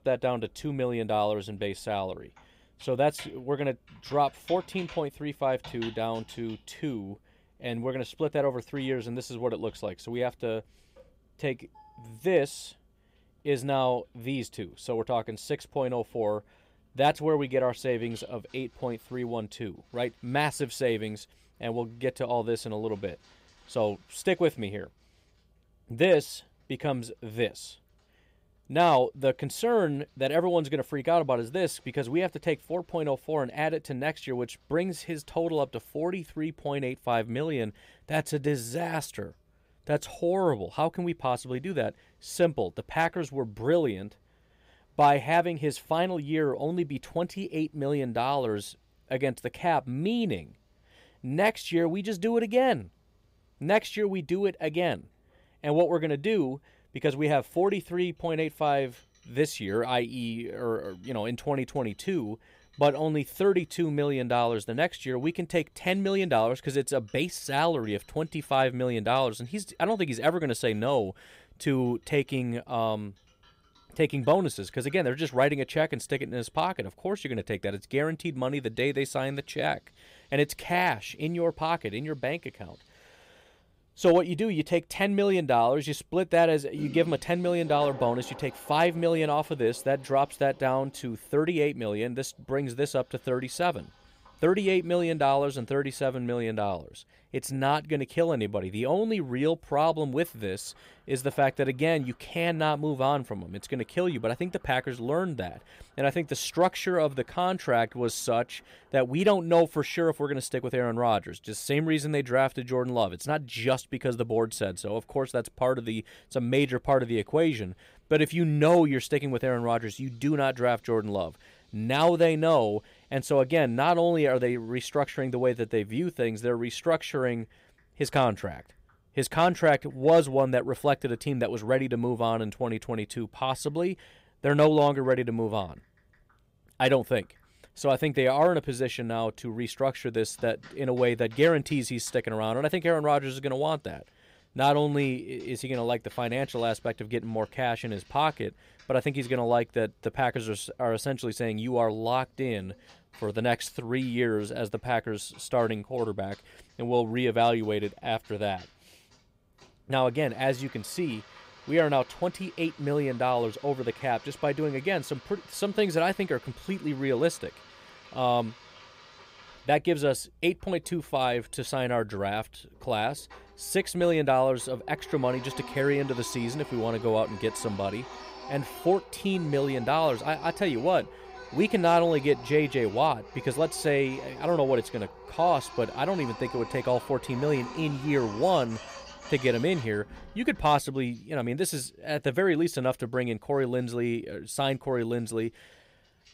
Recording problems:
household noises; noticeable; throughout; 20 dB below the speech

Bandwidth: 15.5 kHz